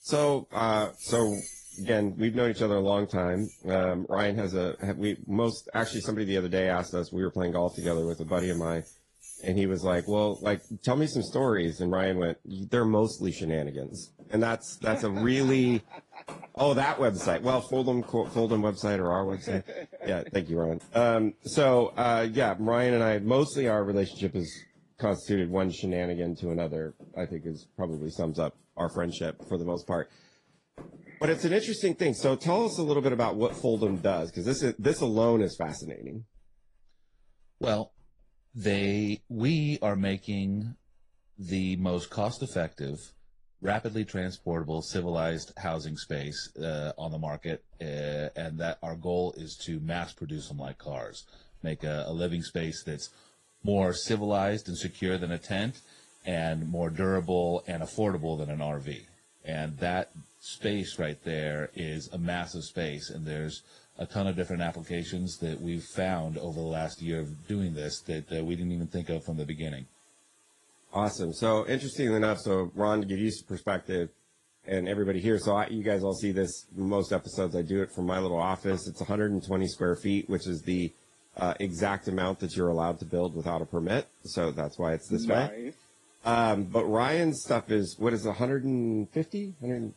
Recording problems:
garbled, watery; slightly; nothing above 10 kHz
household noises; faint; throughout; 25 dB below the speech

